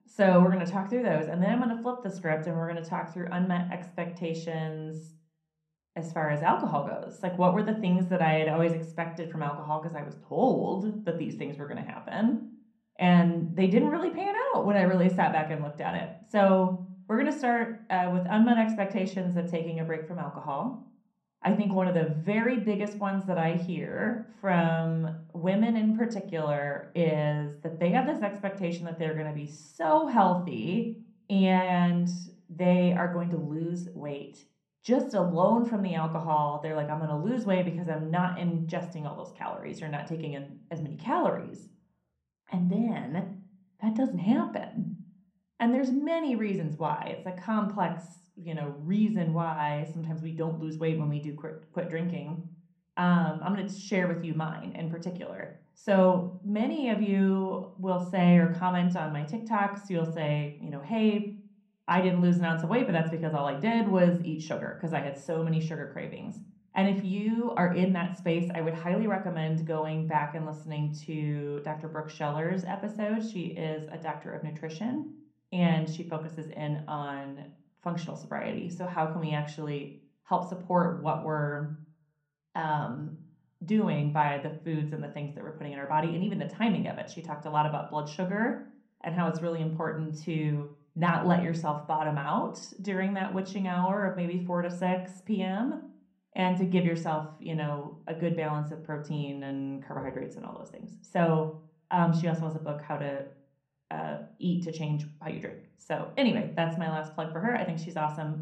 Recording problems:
off-mic speech; far
muffled; slightly; fading above 3 kHz
room echo; slight; dies away in 0.5 s

